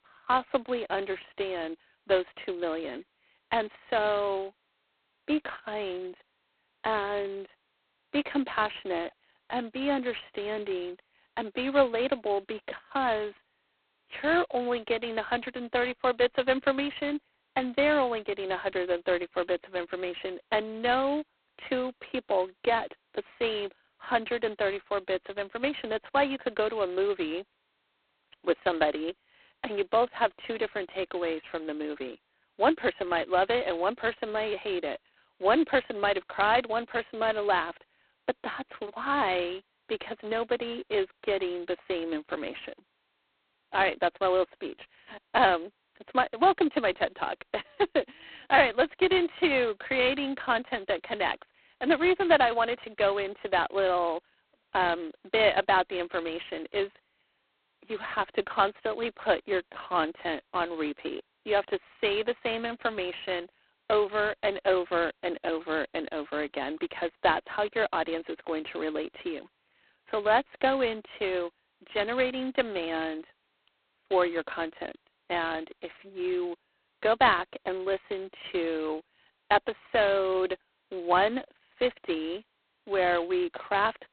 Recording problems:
phone-call audio; poor line; nothing above 4 kHz

